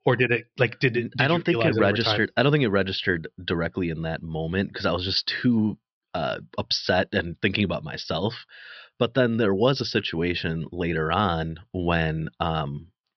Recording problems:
high frequencies cut off; noticeable; nothing above 5.5 kHz

